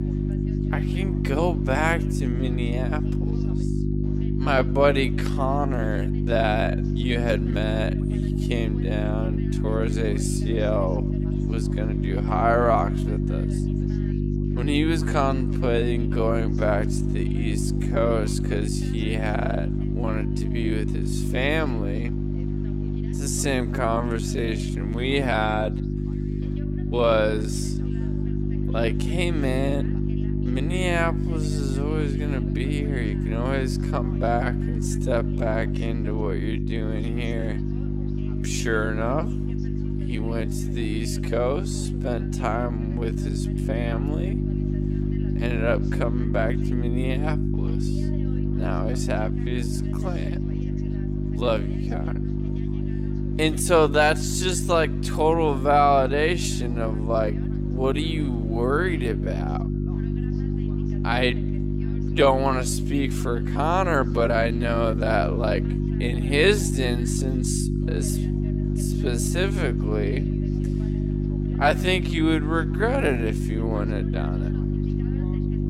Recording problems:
wrong speed, natural pitch; too slow; 0.5 times normal speed
electrical hum; loud; throughout; 50 Hz, 8 dB below the speech
background chatter; faint; throughout; 3 voices, 25 dB below the speech

